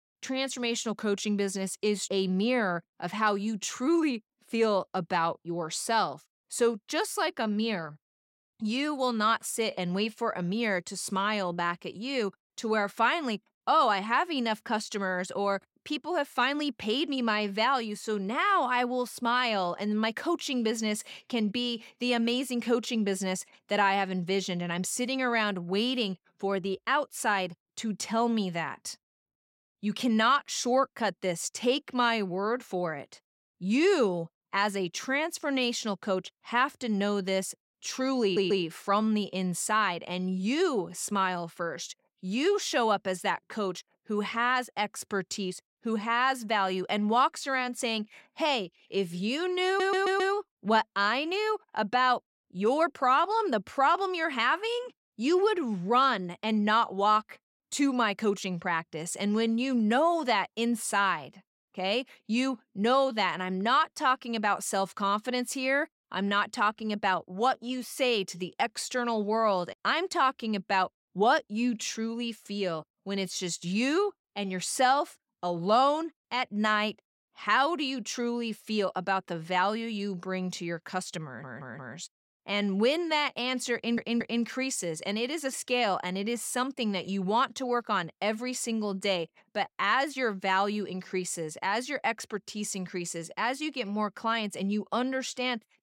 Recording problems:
audio stuttering; 4 times, first at 38 s

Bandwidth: 16.5 kHz